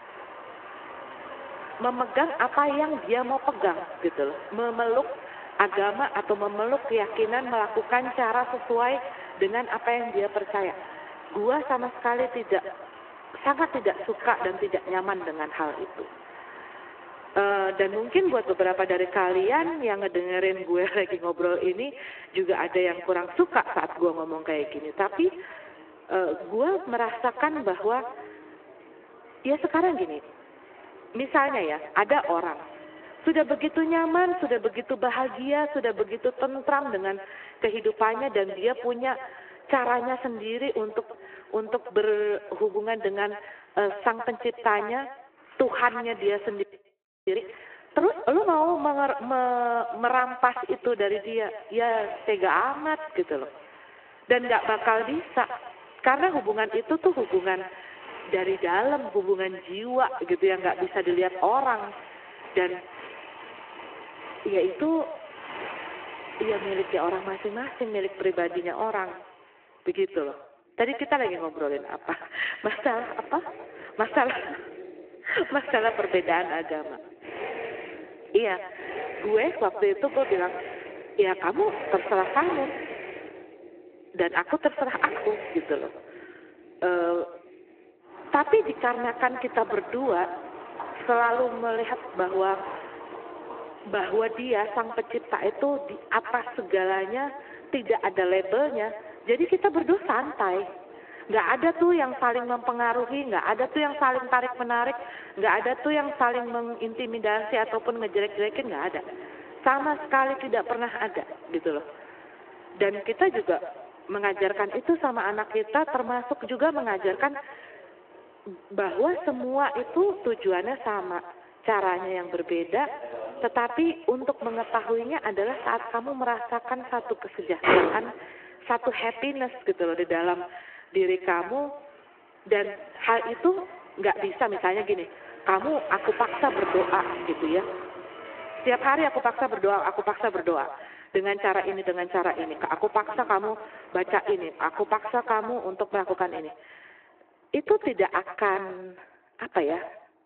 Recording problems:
echo of what is said; noticeable; throughout; 130 ms later, 15 dB below the speech
phone-call audio
traffic noise; noticeable; throughout; 15 dB below the speech
audio freezing; at 47 s for 0.5 s

